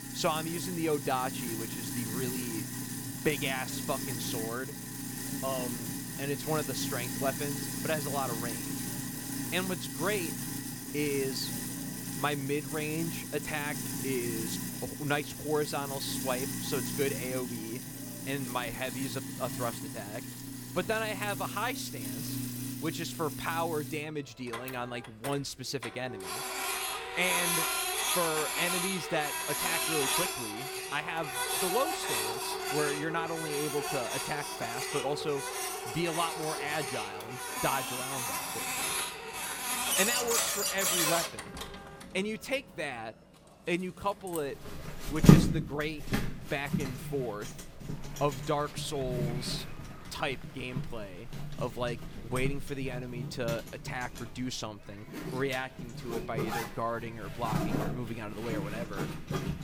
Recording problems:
household noises; very loud; throughout; 2 dB above the speech
chatter from many people; faint; throughout; 25 dB below the speech

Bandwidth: 18.5 kHz